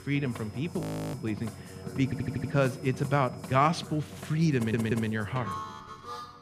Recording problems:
background music; noticeable; throughout; 10 dB below the speech
high-pitched whine; faint; until 4 s; 5 kHz, 30 dB below the speech
audio freezing; at 1 s
audio stuttering; at 2 s and at 4.5 s

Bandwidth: 15 kHz